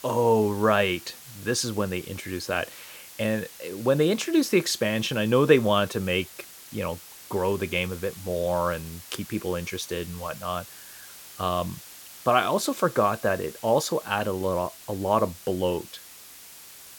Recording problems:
hiss; noticeable; throughout; 15 dB below the speech

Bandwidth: 17 kHz